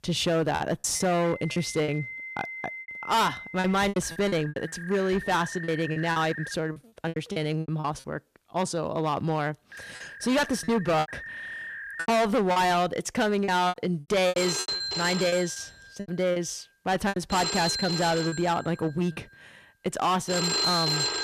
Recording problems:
distortion; heavy; 10% of the sound clipped
alarms or sirens; loud; throughout; 5 dB below the speech
choppy; very; 11% of the speech affected

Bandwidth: 14.5 kHz